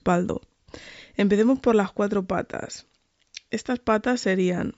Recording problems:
high frequencies cut off; noticeable; nothing above 8 kHz

